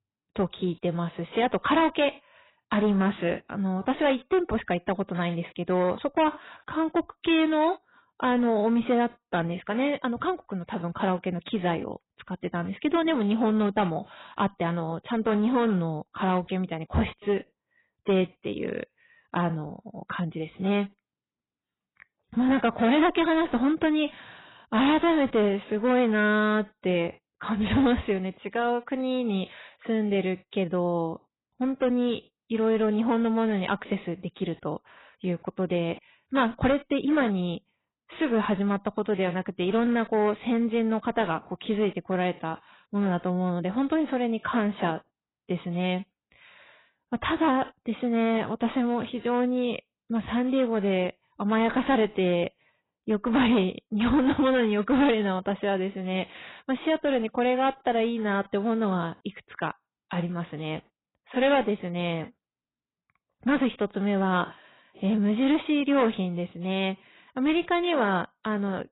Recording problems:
garbled, watery; badly; nothing above 4 kHz
distortion; slight; 5% of the sound clipped

